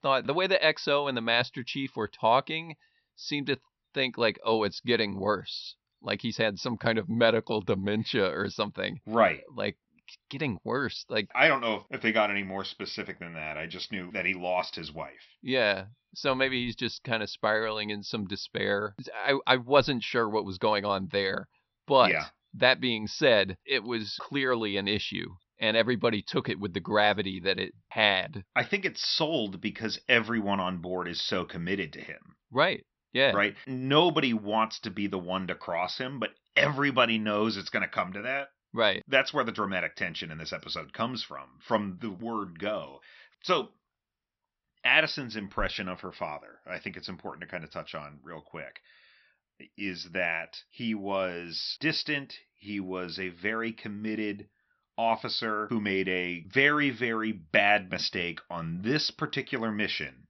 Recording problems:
high frequencies cut off; noticeable; nothing above 6 kHz

